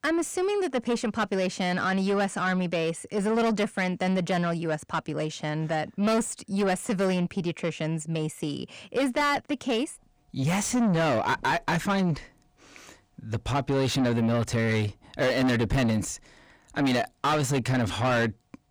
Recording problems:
distortion; heavy; 6 dB below the speech

